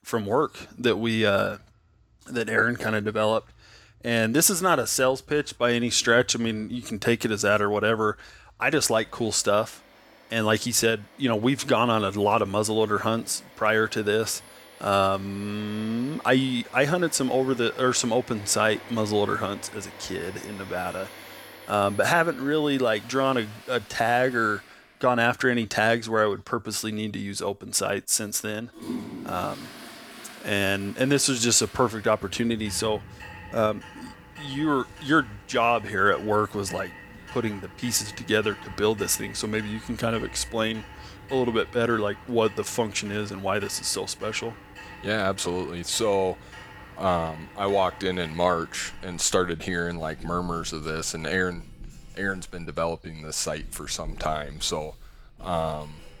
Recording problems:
household noises; noticeable; throughout; 20 dB below the speech

